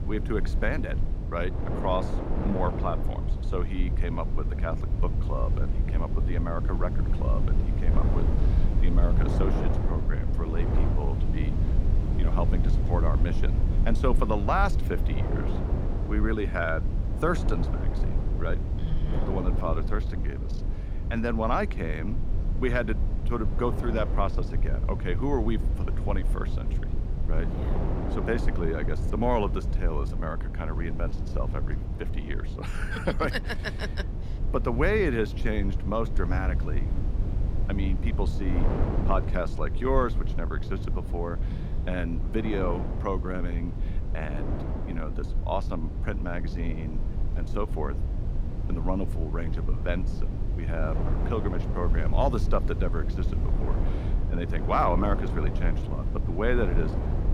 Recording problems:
wind noise on the microphone; occasional gusts; 10 dB below the speech
low rumble; noticeable; throughout; 10 dB below the speech

